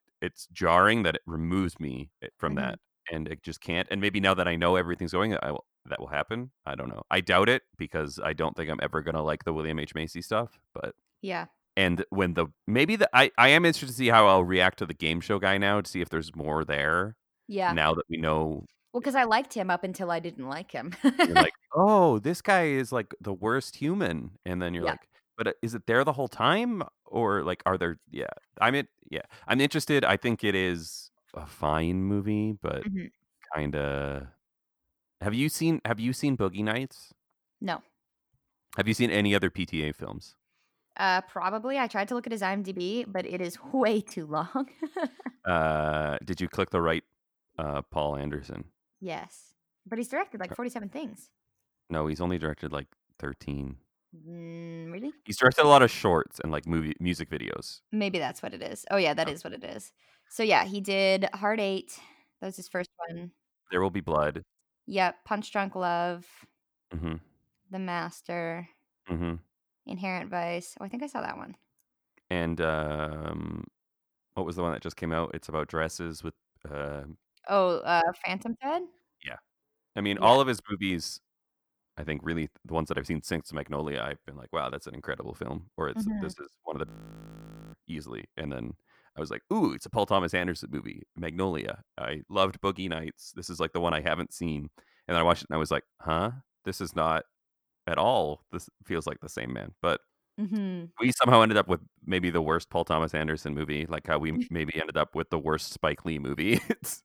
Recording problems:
audio freezing; at 1:27 for 1 s

